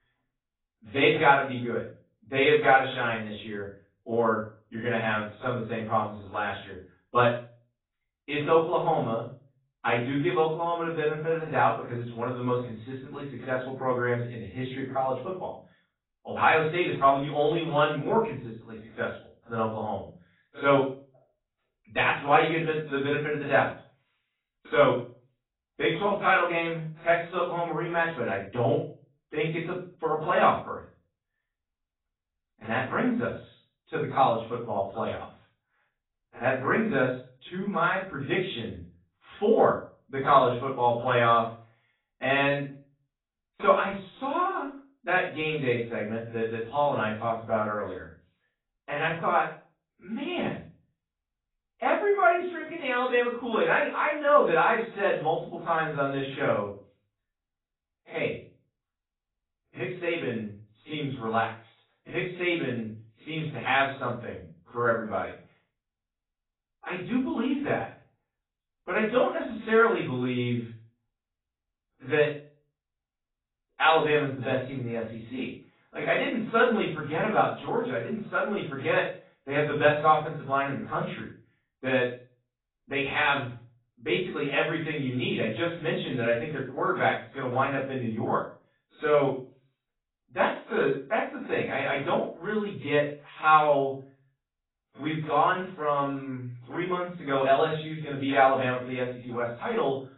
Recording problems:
off-mic speech; far
garbled, watery; badly; nothing above 4 kHz
room echo; slight; dies away in 0.3 s

